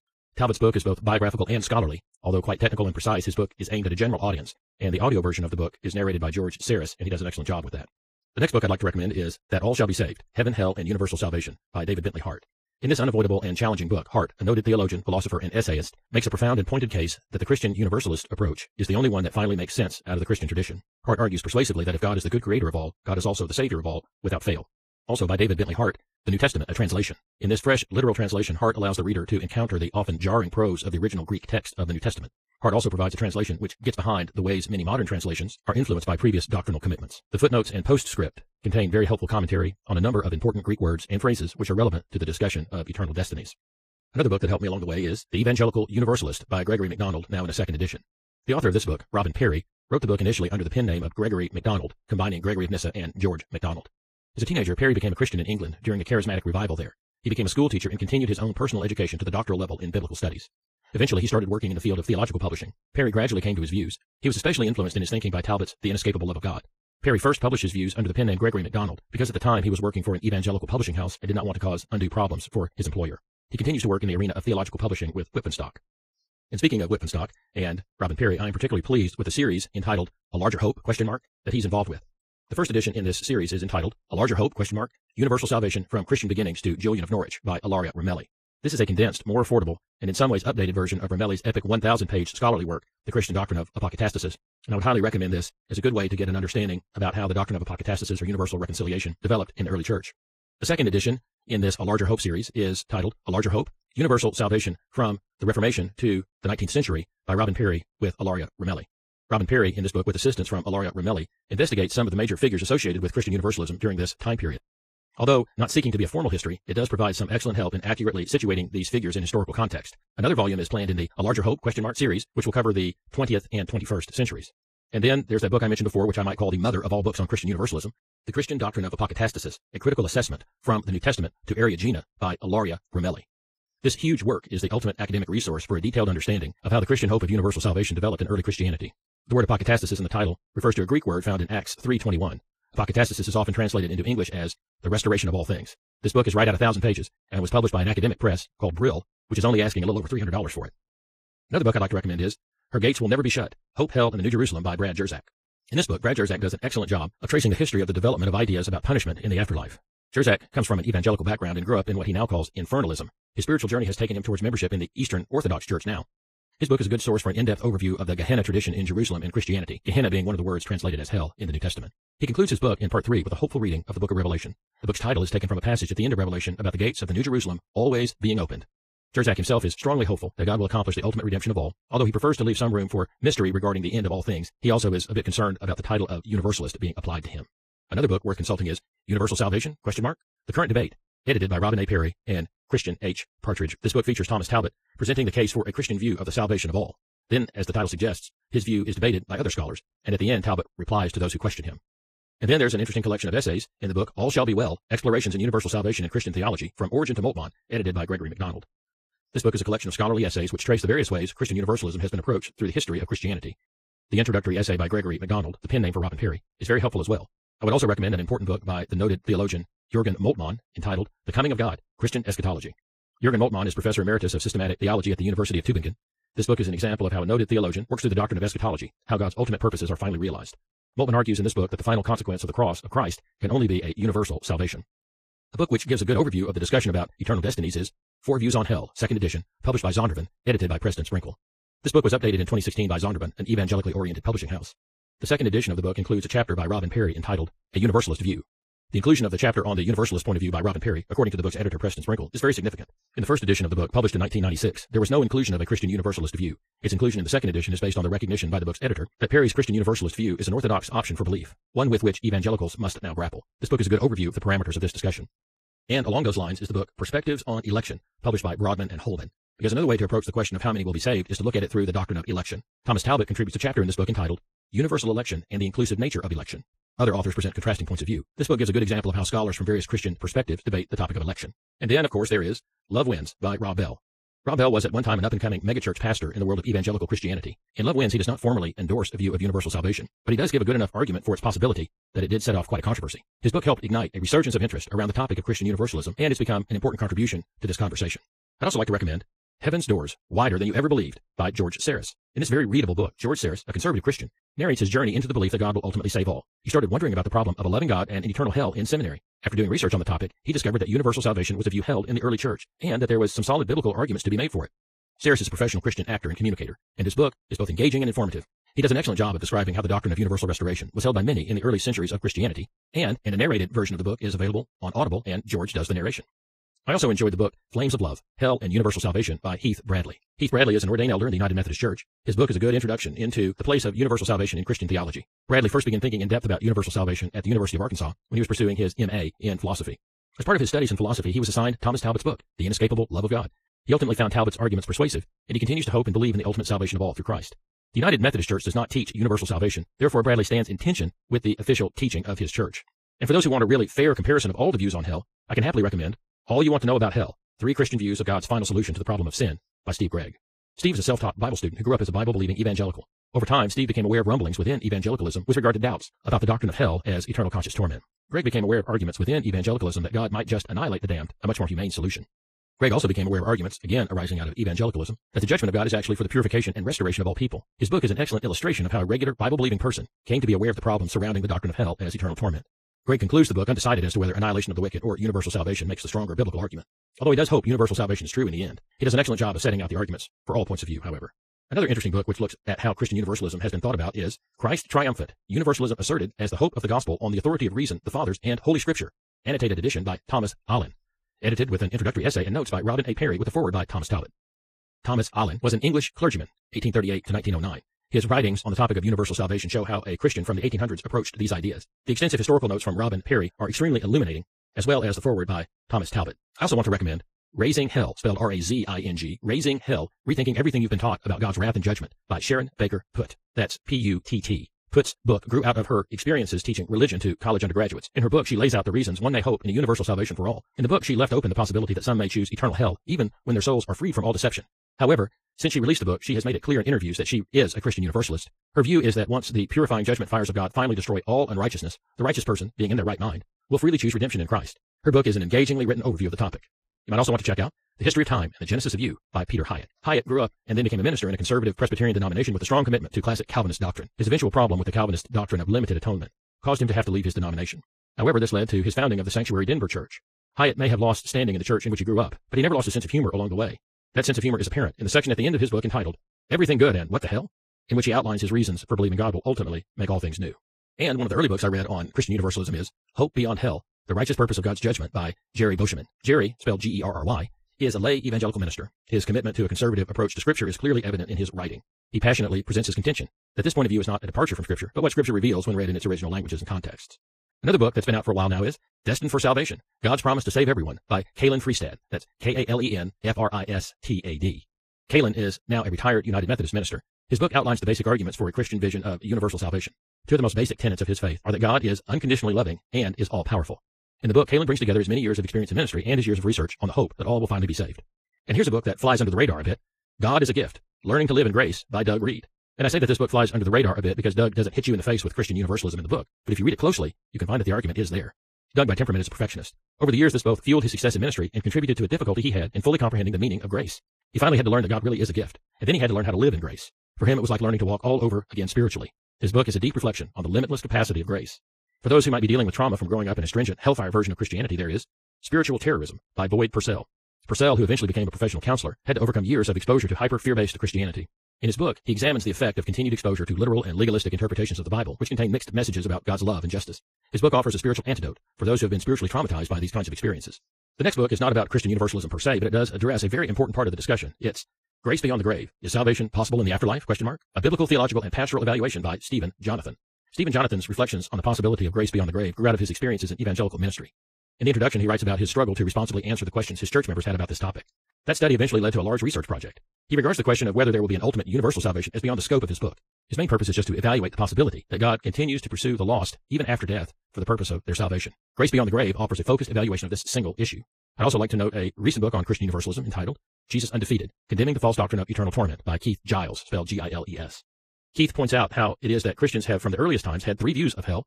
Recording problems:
wrong speed, natural pitch; too fast; 1.8 times normal speed
garbled, watery; slightly; nothing above 14.5 kHz

